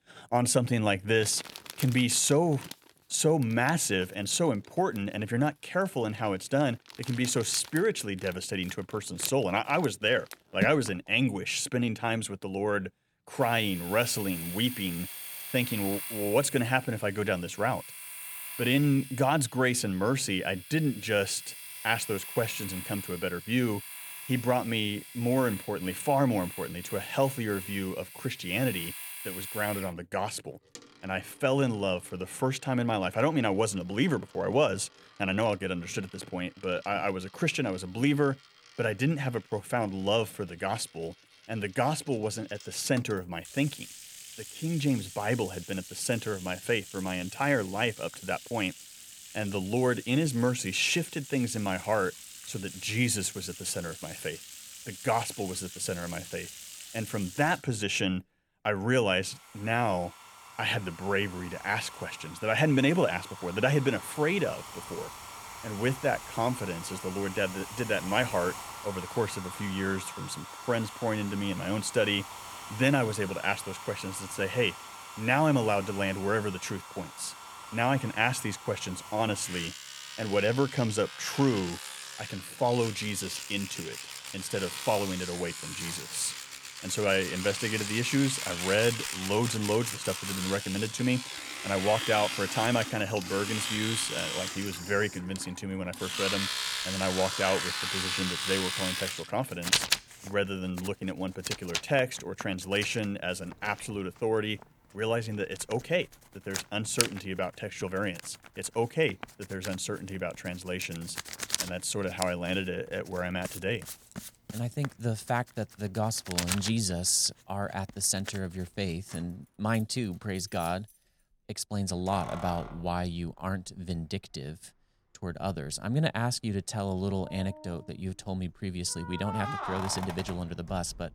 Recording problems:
household noises; loud; throughout; 8 dB below the speech

